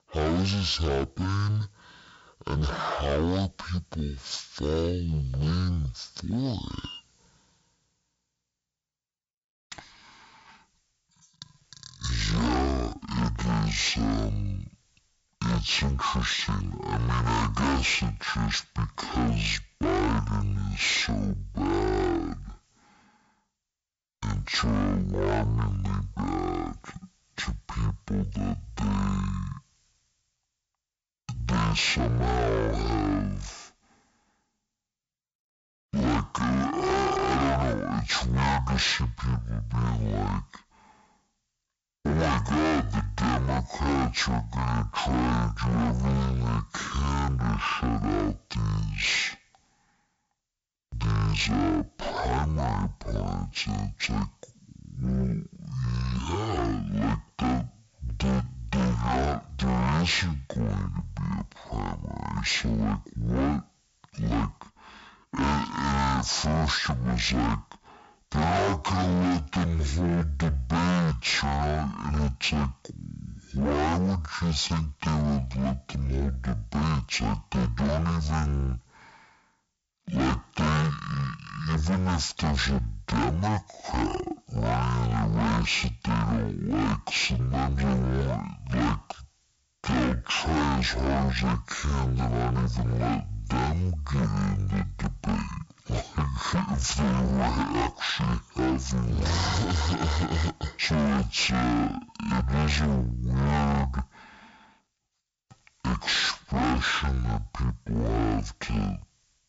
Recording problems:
distortion; heavy; 16% of the sound clipped
wrong speed and pitch; too slow and too low; 0.5 times normal speed

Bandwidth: 7.5 kHz